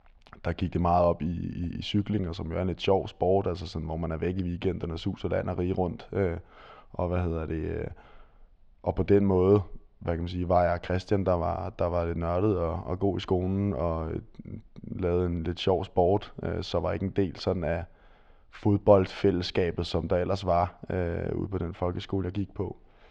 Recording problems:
muffled; slightly; fading above 4 kHz

